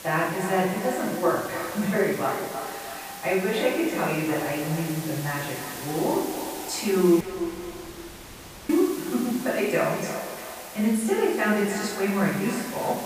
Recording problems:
echo of what is said; strong; throughout; 300 ms later, 10 dB below the speech
off-mic speech; far
room echo; noticeable; dies away in 0.6 s
hiss; noticeable; throughout; 10 dB below the speech
audio cutting out; at 7 s for 1.5 s

